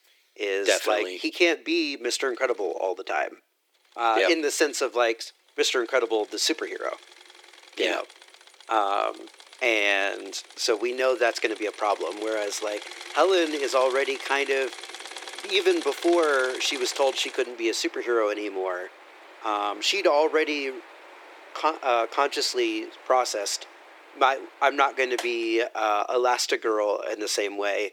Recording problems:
thin; very; fading below 350 Hz
machinery noise; noticeable; throughout; 15 dB below the speech

